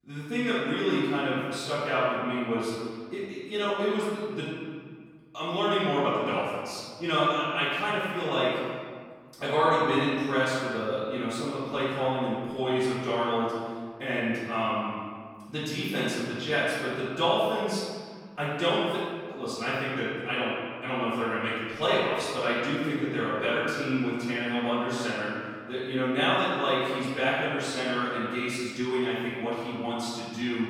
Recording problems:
room echo; strong; dies away in 1.7 s
off-mic speech; far

